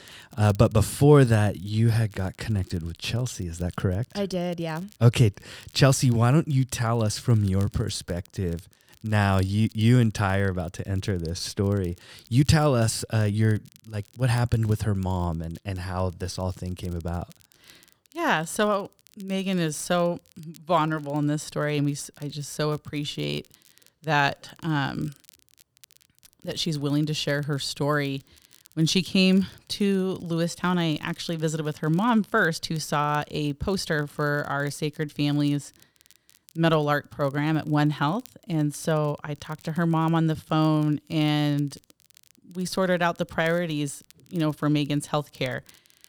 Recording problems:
crackle, like an old record; faint; 30 dB below the speech

